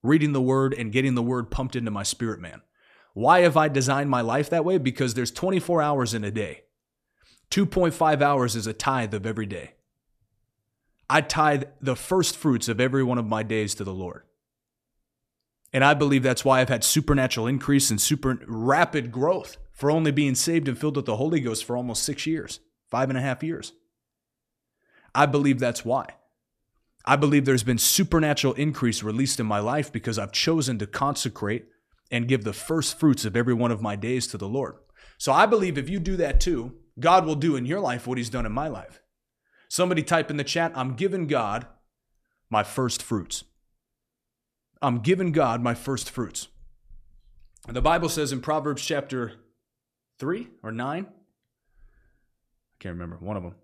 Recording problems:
none

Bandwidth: 14 kHz